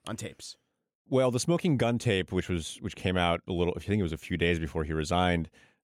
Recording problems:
none

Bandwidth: 17.5 kHz